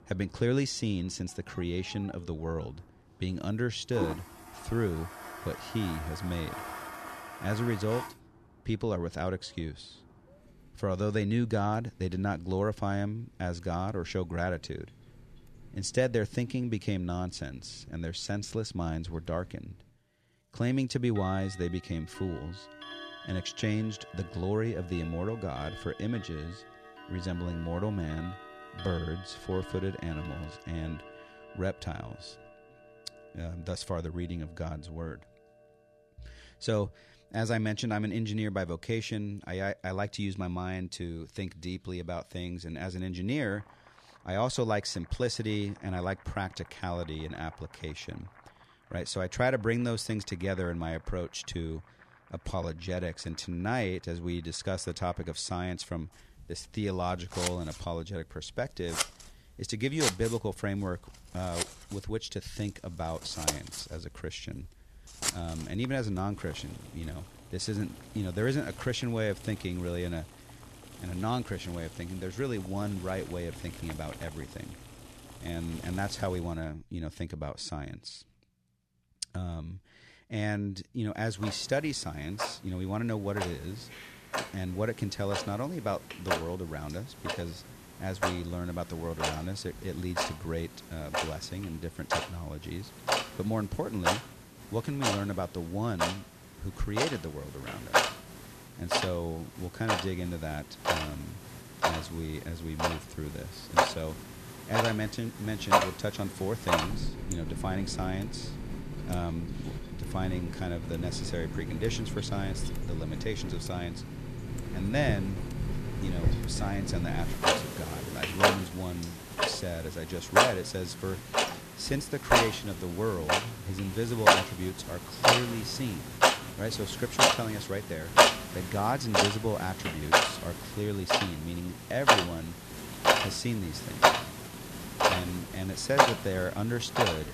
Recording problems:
household noises; very loud; throughout; 4 dB above the speech

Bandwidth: 14 kHz